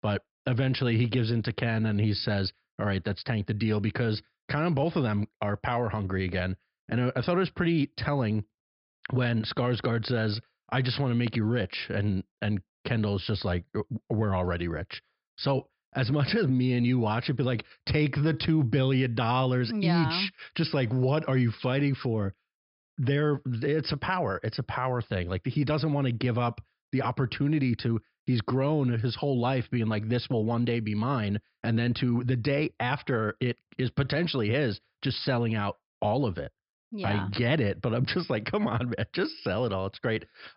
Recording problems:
high frequencies cut off; noticeable; nothing above 5.5 kHz

